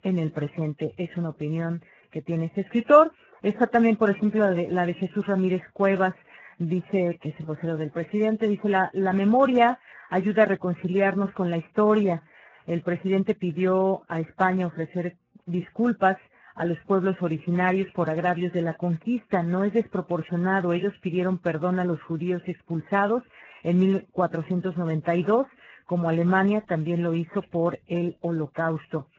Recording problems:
garbled, watery; badly; nothing above 7.5 kHz

